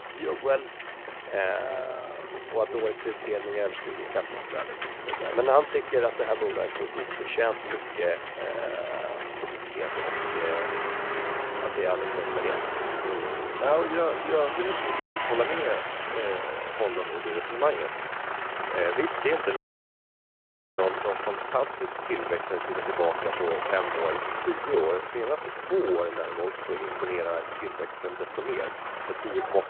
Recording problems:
phone-call audio
traffic noise; loud; throughout; 3 dB below the speech
crowd noise; faint; throughout; 20 dB below the speech
audio cutting out; at 15 s and at 20 s for 1 s

